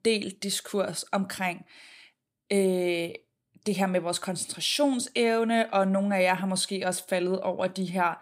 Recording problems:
none

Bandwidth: 15.5 kHz